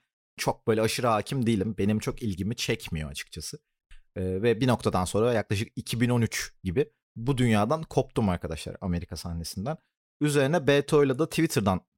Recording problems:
none

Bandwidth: 16.5 kHz